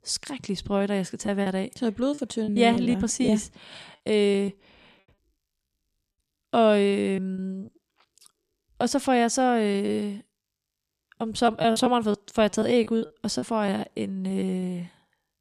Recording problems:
choppy; very; 8% of the speech affected

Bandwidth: 14.5 kHz